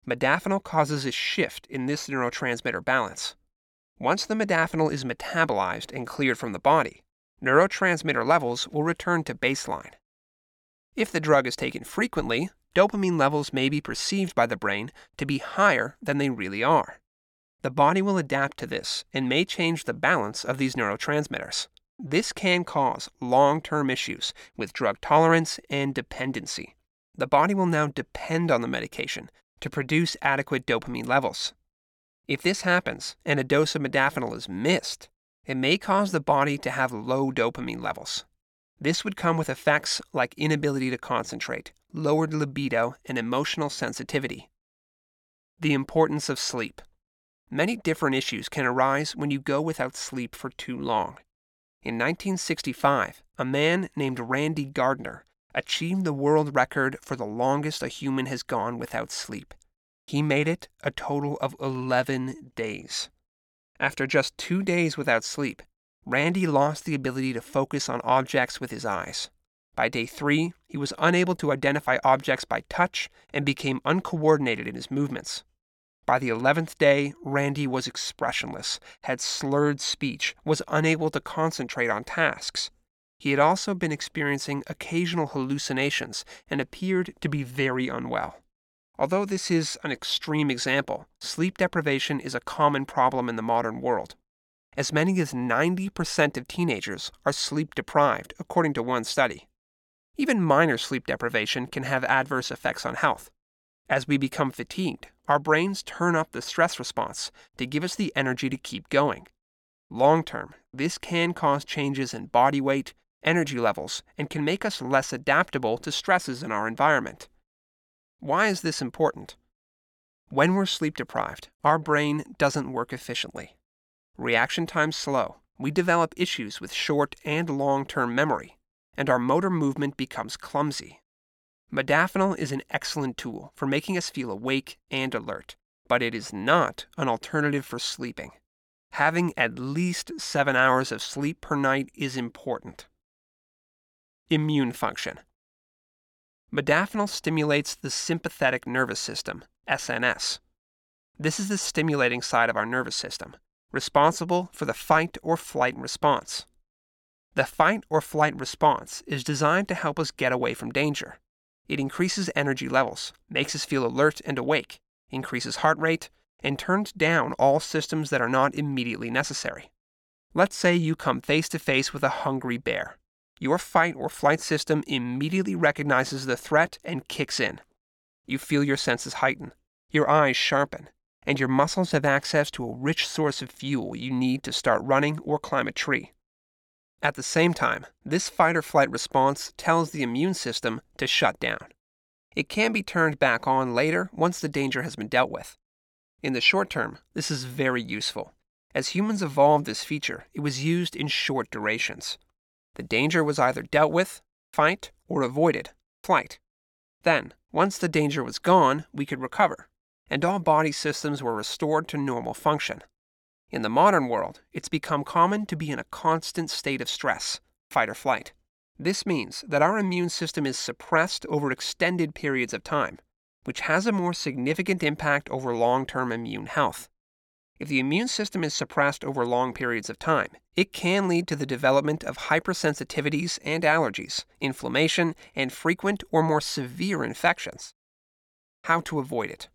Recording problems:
none

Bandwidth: 17 kHz